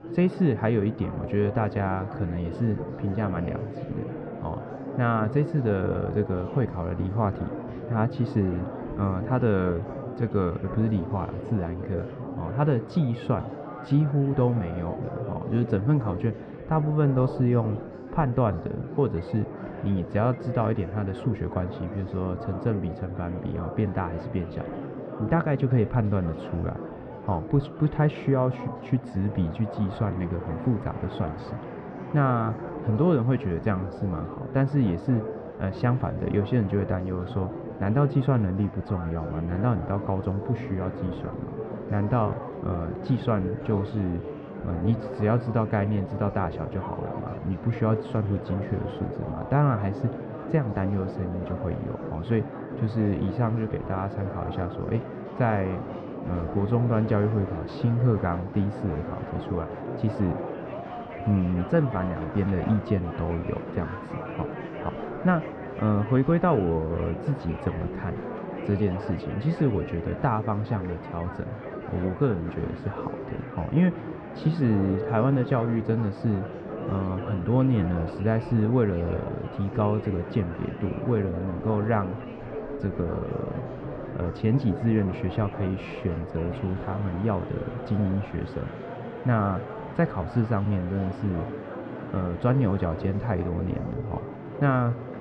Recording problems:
muffled; very; fading above 1 kHz
murmuring crowd; loud; throughout; 9 dB below the speech
household noises; very faint; until 42 s; 40 dB below the speech

